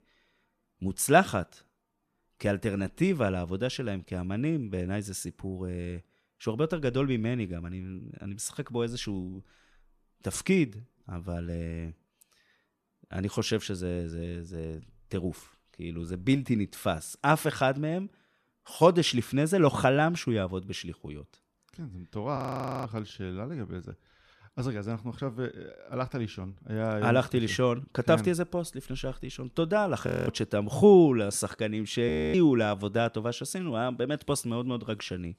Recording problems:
audio freezing; at 22 s, at 30 s and at 32 s

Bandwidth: 14 kHz